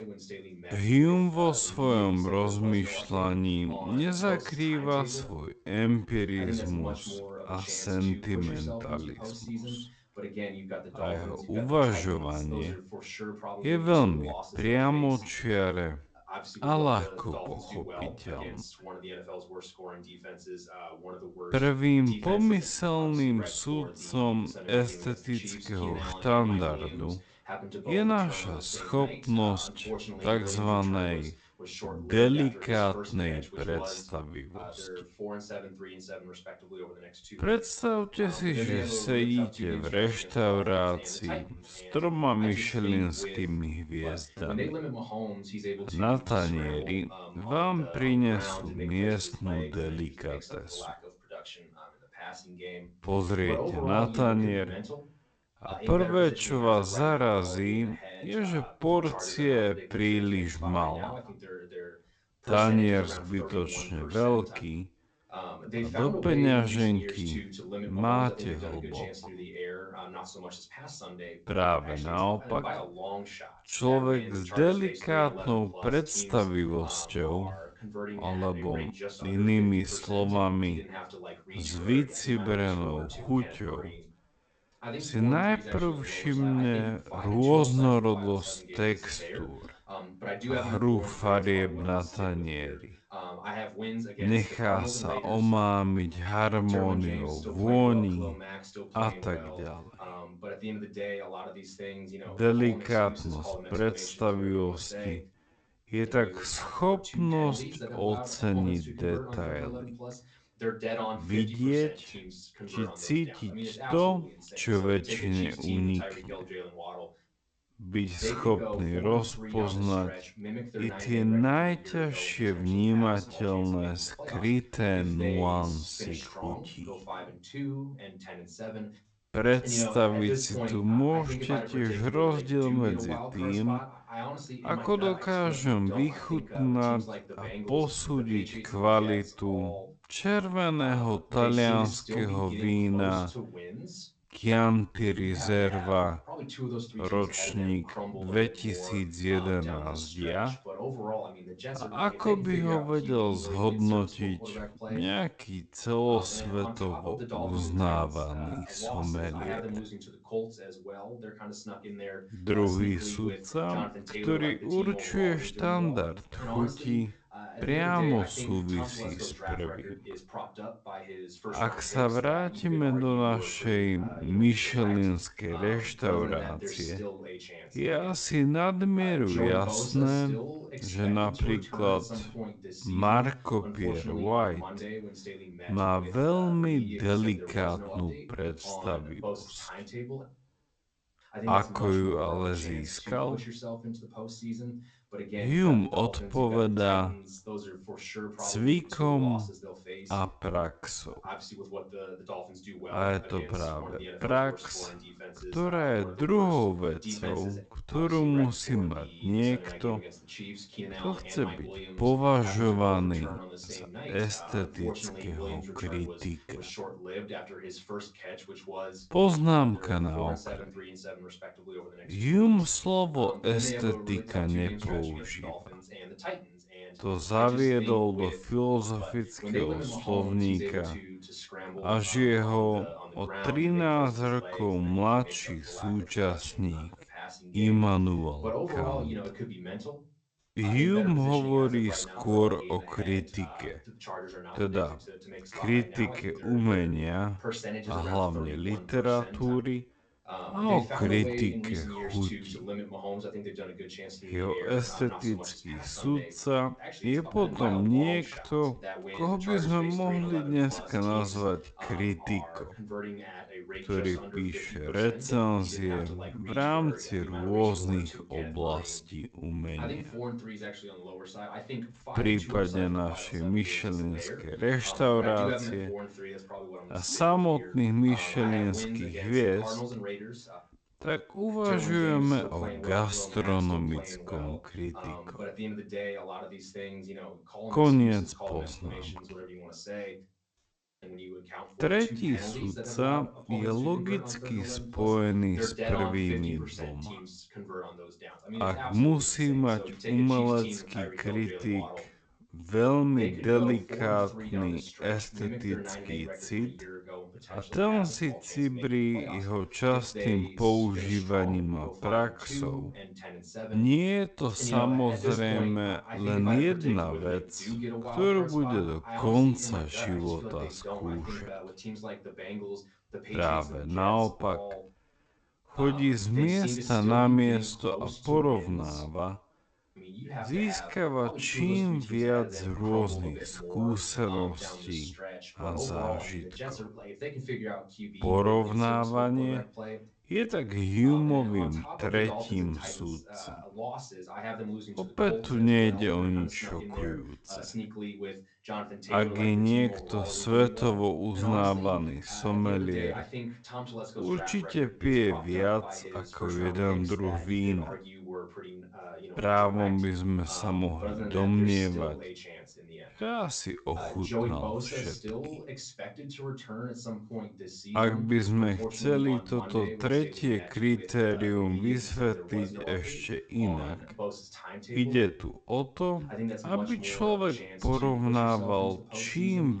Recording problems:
wrong speed, natural pitch; too slow; 0.5 times normal speed
garbled, watery; slightly; nothing above 8 kHz
voice in the background; noticeable; throughout; 10 dB below the speech
abrupt cut into speech; at the end

